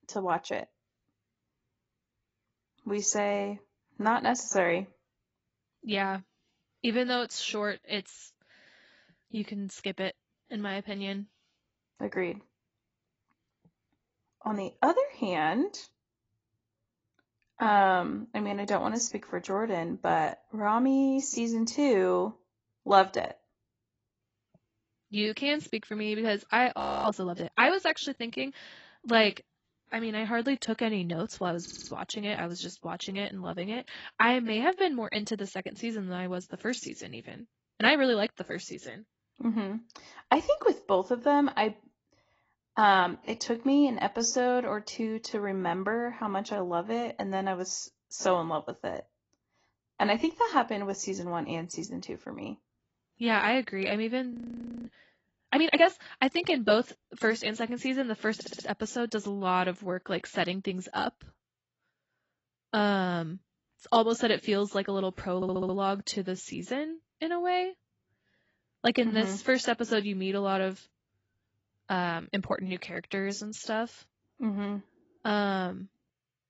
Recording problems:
garbled, watery; badly; nothing above 7.5 kHz
audio freezing; at 27 s and at 54 s for 0.5 s
audio stuttering; at 32 s, at 58 s and at 1:05

